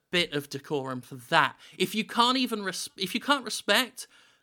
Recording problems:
none

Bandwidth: 19 kHz